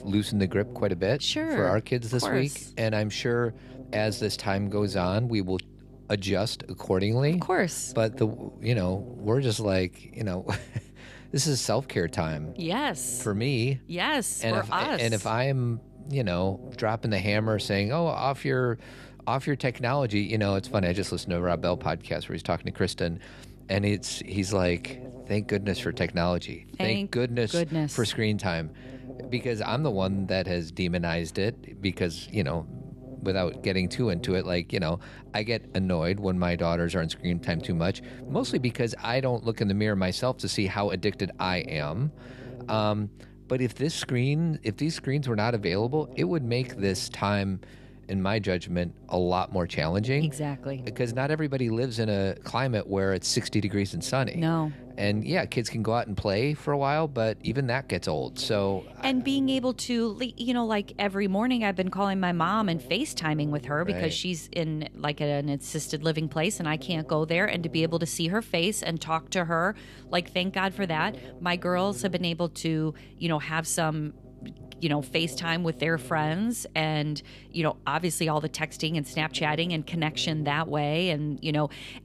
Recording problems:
electrical hum; faint; throughout; 50 Hz, 20 dB below the speech

